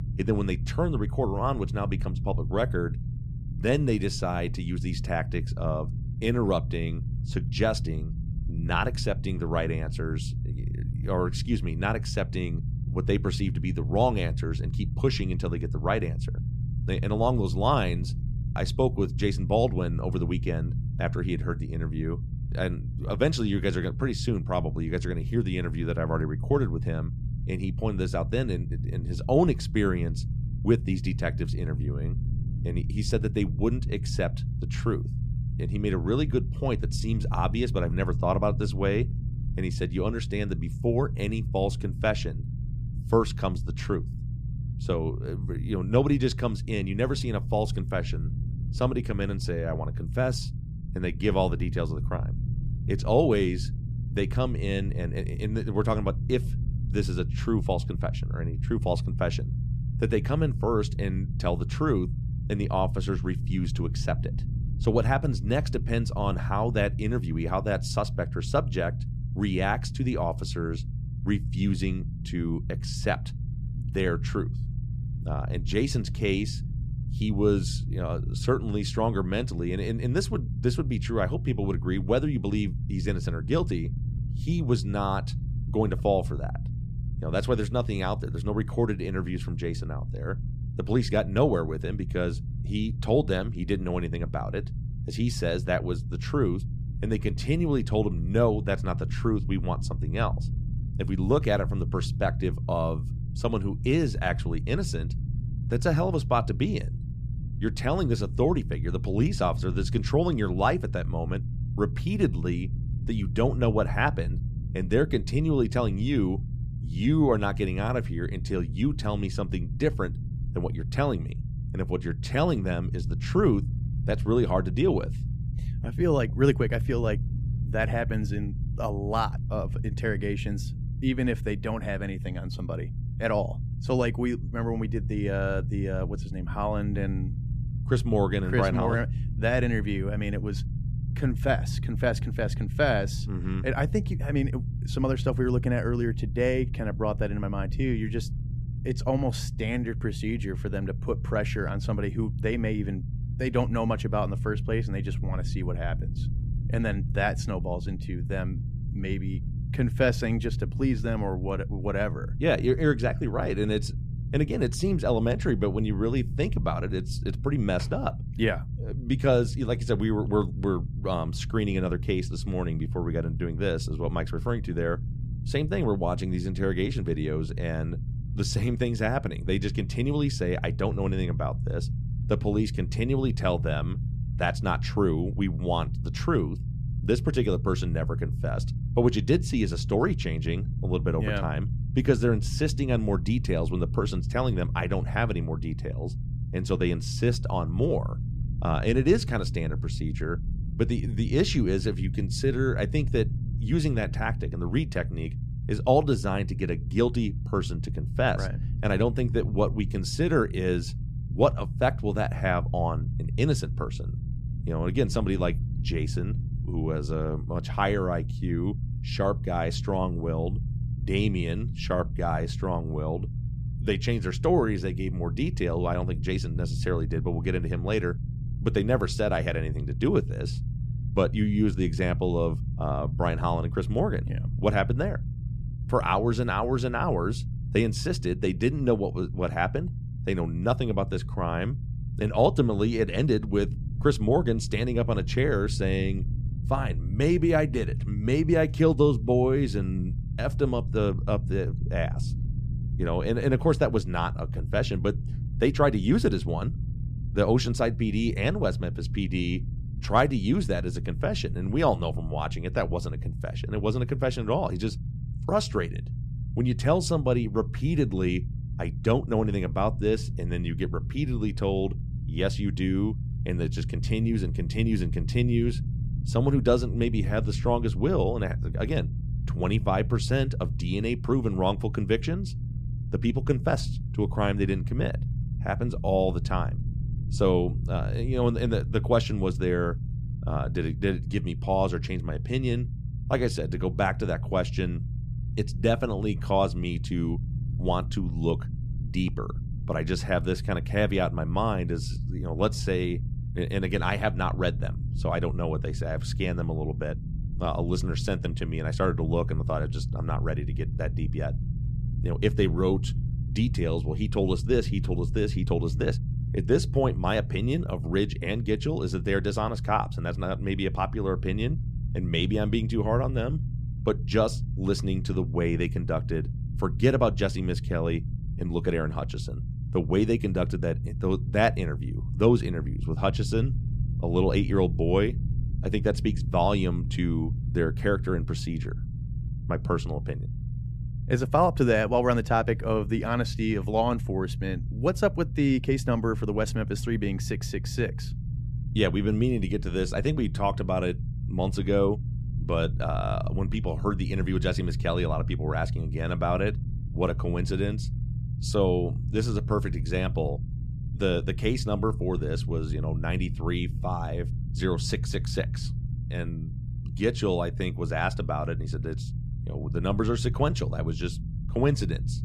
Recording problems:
low rumble; noticeable; throughout; 15 dB below the speech

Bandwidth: 14.5 kHz